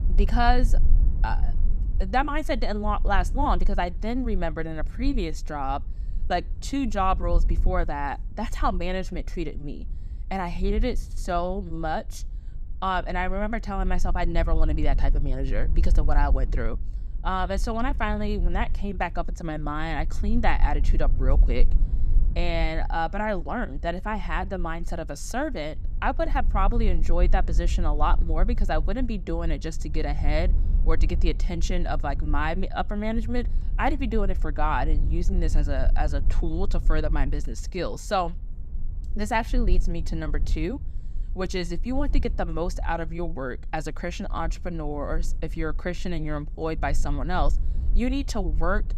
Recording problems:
low rumble; faint; throughout; 20 dB below the speech

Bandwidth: 14.5 kHz